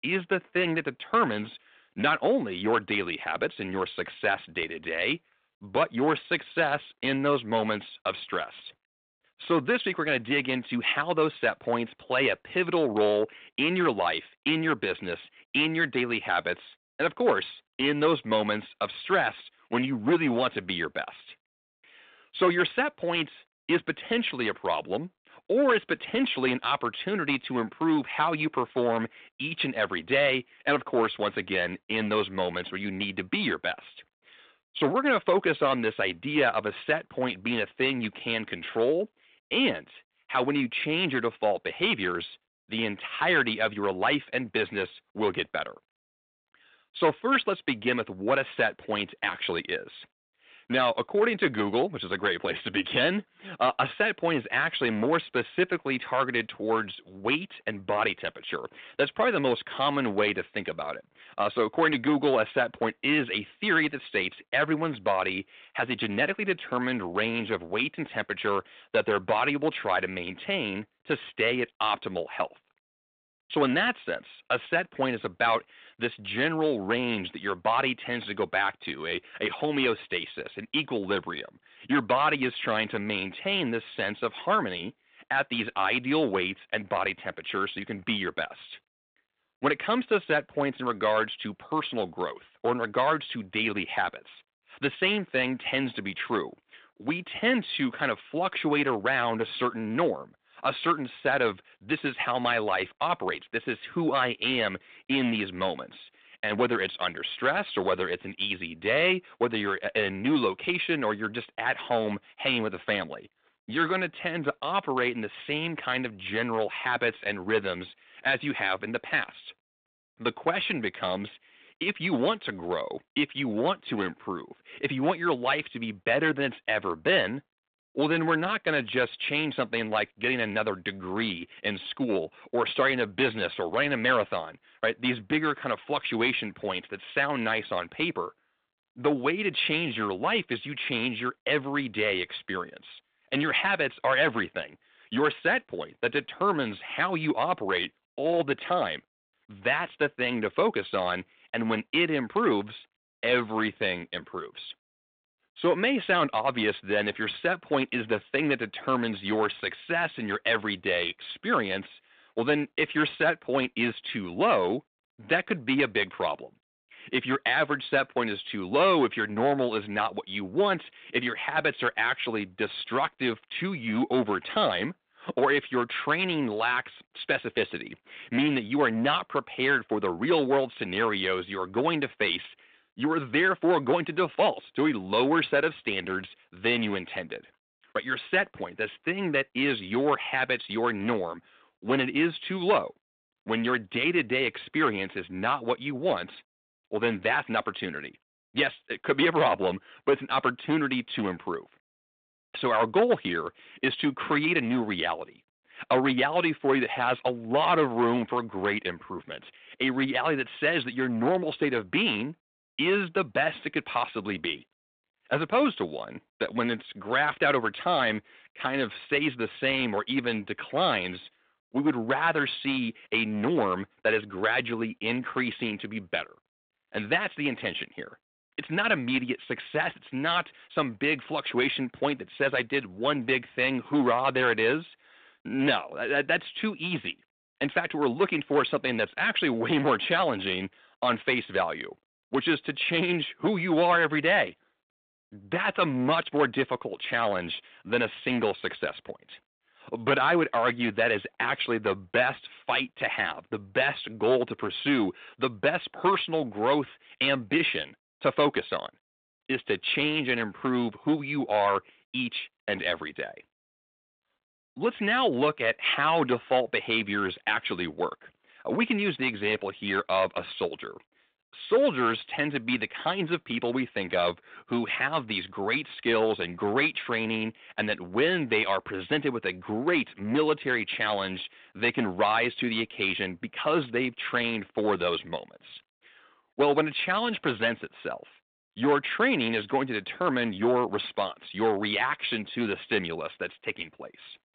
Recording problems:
phone-call audio; nothing above 4 kHz
distortion; slight; 3% of the sound clipped

